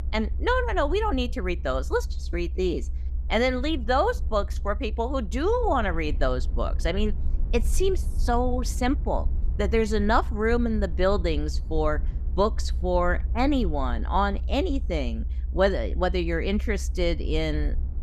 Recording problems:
low rumble; faint; throughout; 25 dB below the speech

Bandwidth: 14.5 kHz